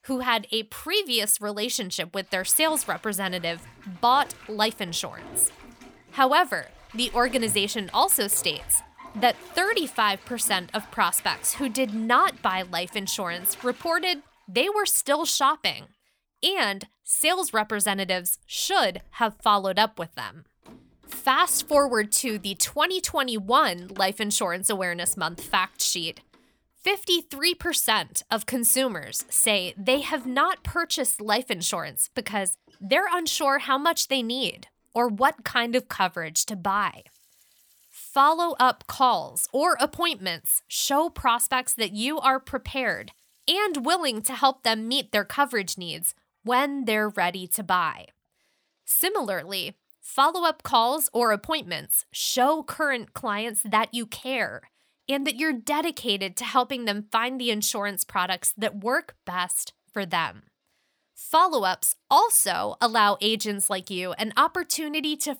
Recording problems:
household noises; faint; throughout; 25 dB below the speech

